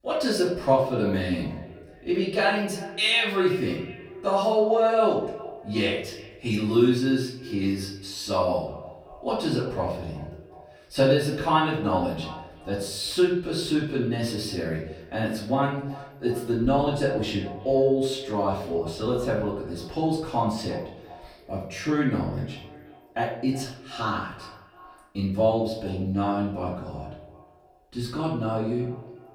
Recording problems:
off-mic speech; far
echo of what is said; noticeable; throughout; 360 ms later, 15 dB below the speech
room echo; noticeable; dies away in 0.6 s

